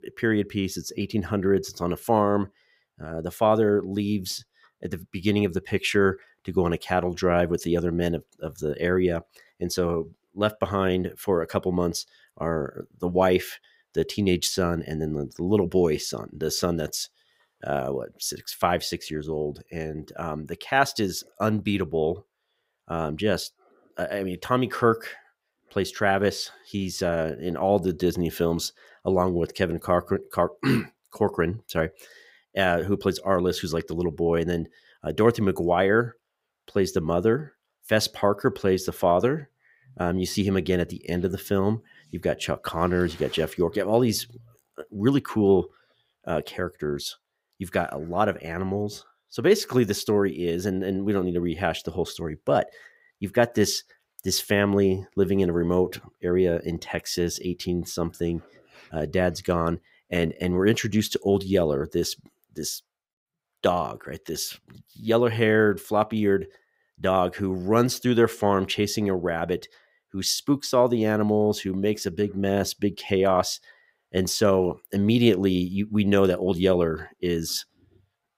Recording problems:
none

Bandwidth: 15.5 kHz